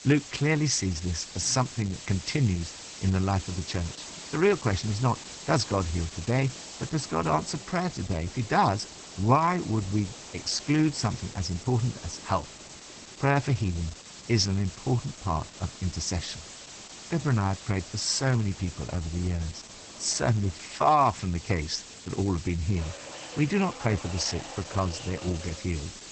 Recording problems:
garbled, watery; badly; nothing above 8 kHz
hiss; noticeable; throughout; 15 dB below the speech
train or aircraft noise; faint; throughout; 20 dB below the speech

